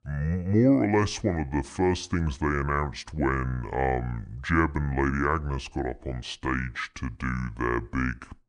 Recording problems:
wrong speed and pitch; too slow and too low; 0.6 times normal speed

